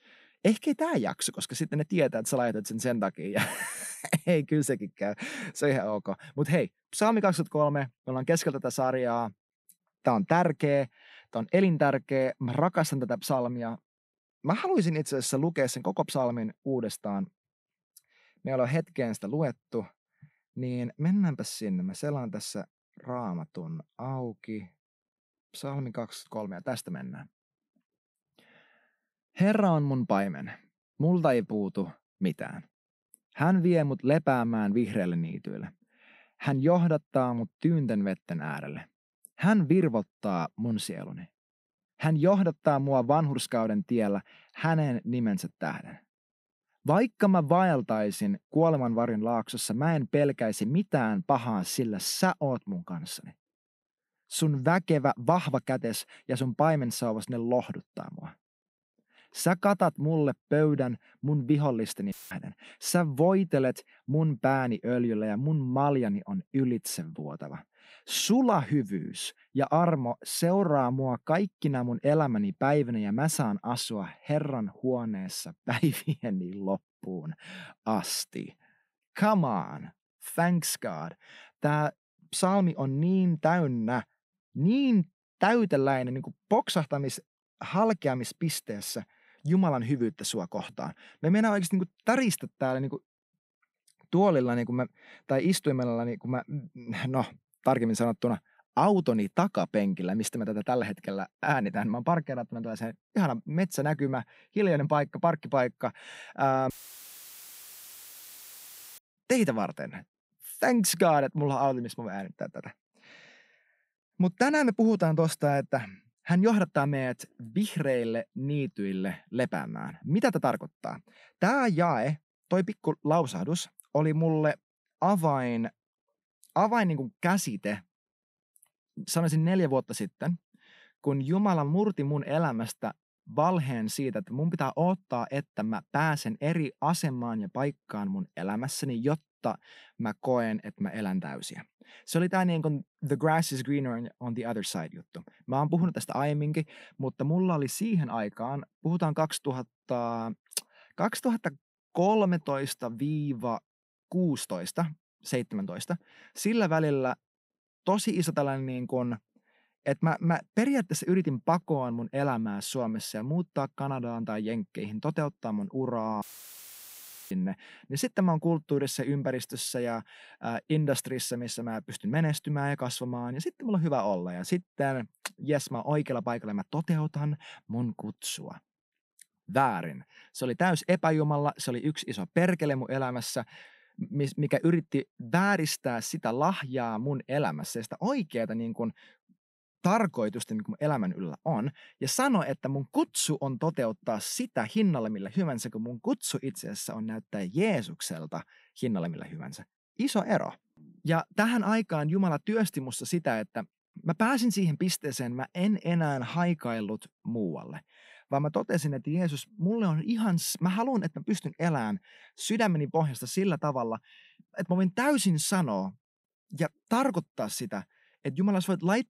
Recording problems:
audio cutting out; filled with static; at 1:02, at 1:47 for 2.5 s and at 2:46 for 1 s

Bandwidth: 15.5 kHz